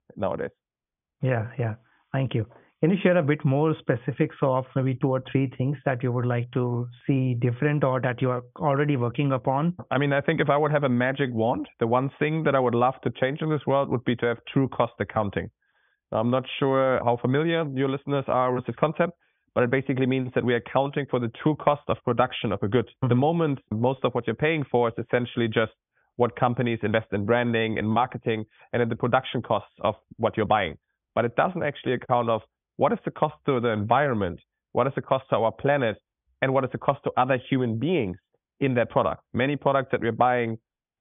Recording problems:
high frequencies cut off; severe; nothing above 3.5 kHz

